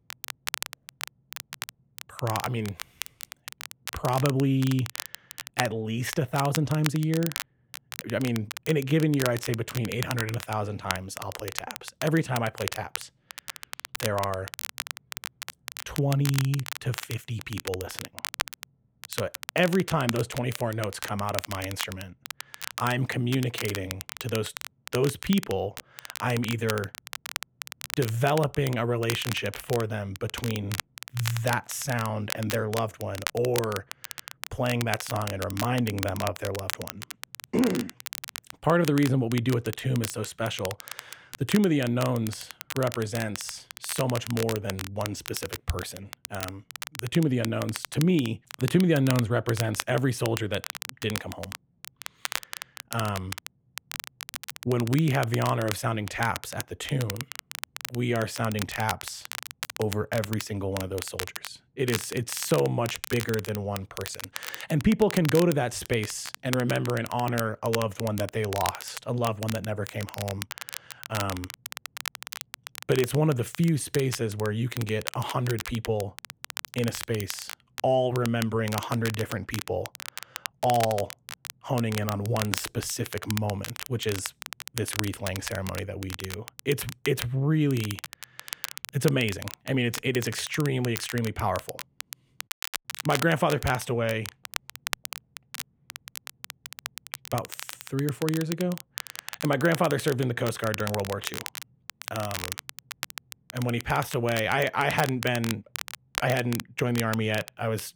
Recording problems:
crackle, like an old record; loud; 9 dB below the speech

